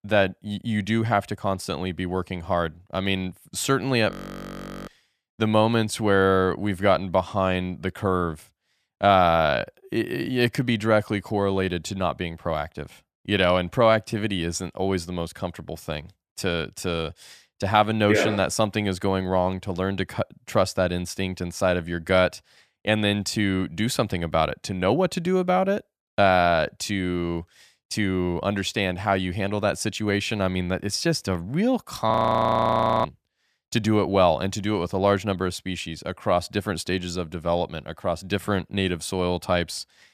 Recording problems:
audio freezing; at 4 s for 1 s and at 32 s for 1 s

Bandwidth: 14.5 kHz